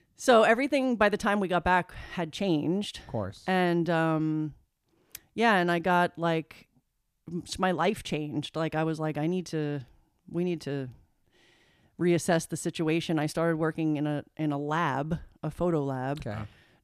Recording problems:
none

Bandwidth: 14.5 kHz